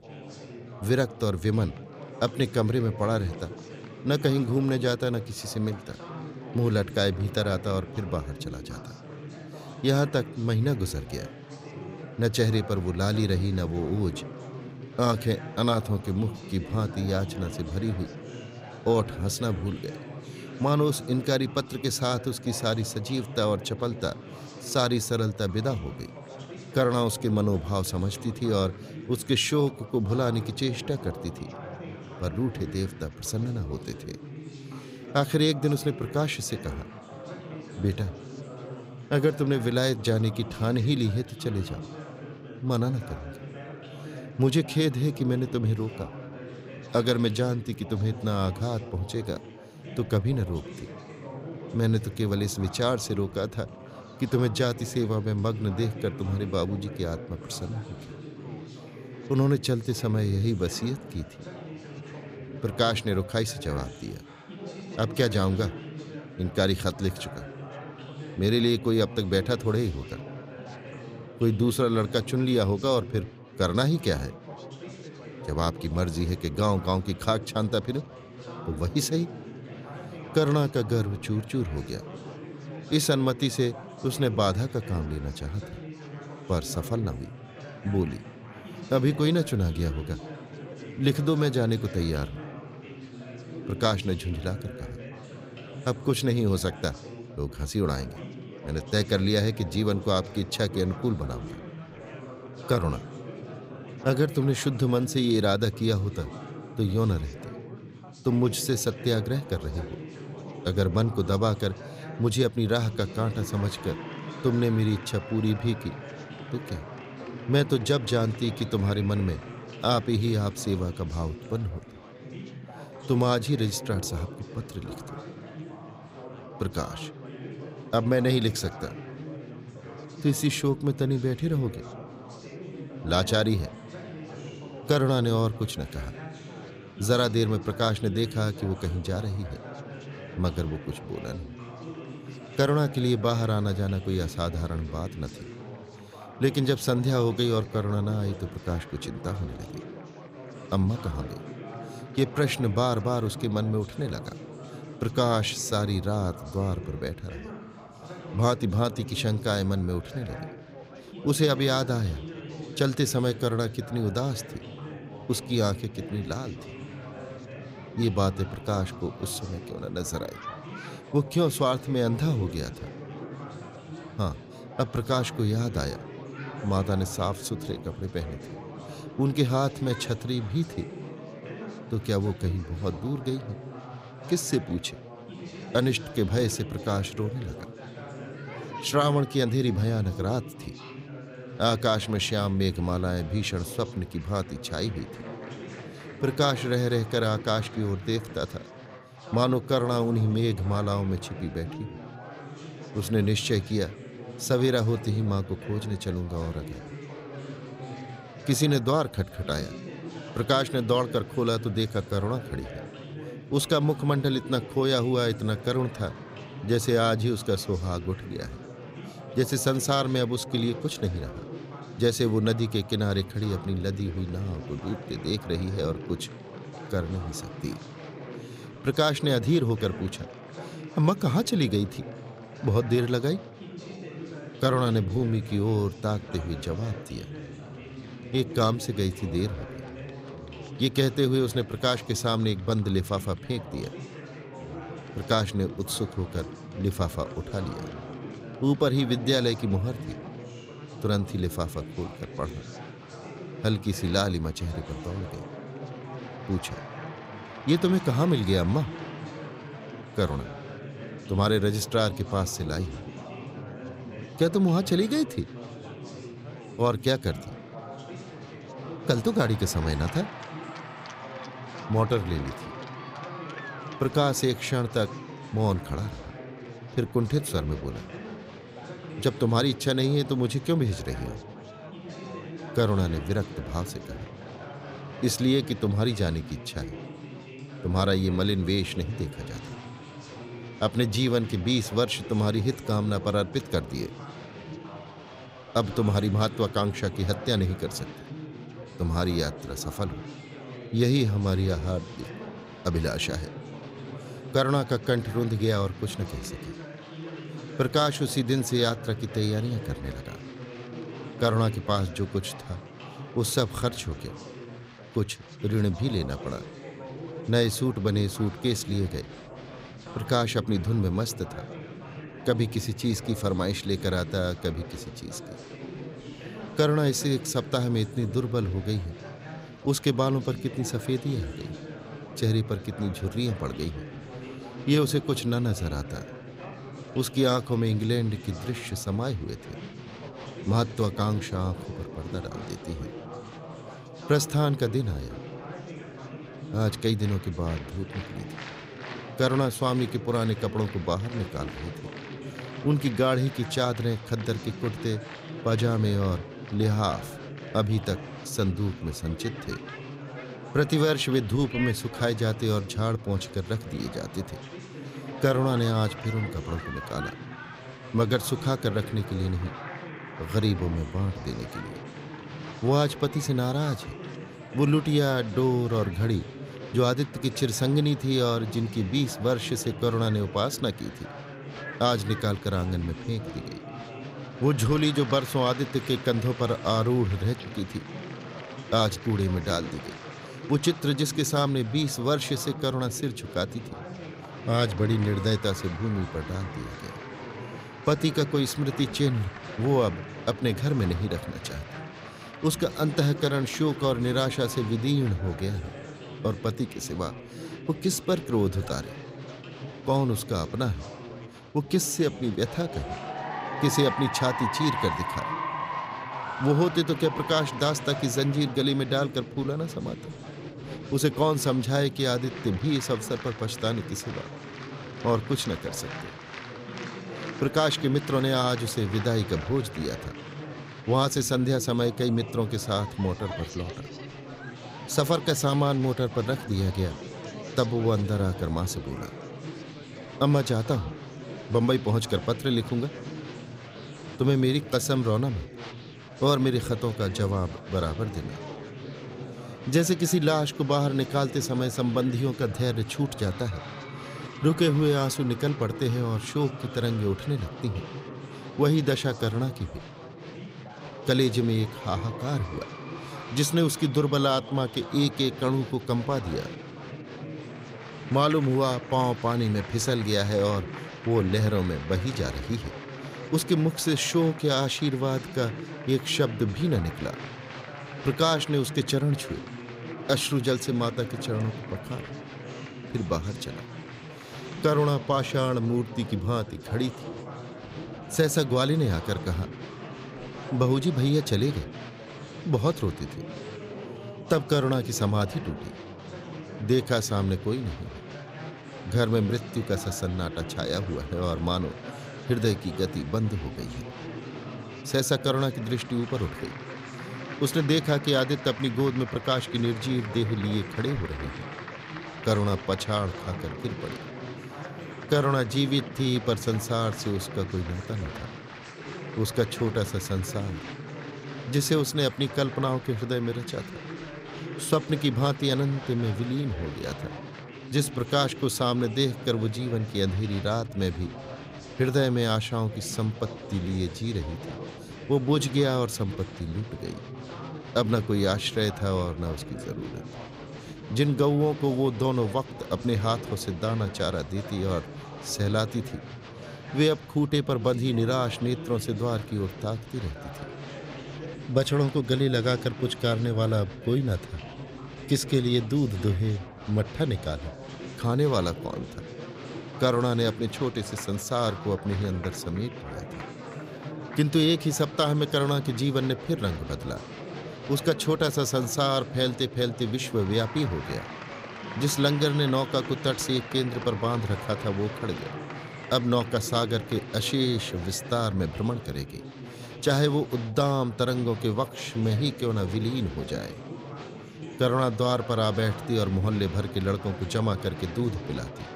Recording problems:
chatter from many people; noticeable; throughout; 15 dB below the speech

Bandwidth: 15.5 kHz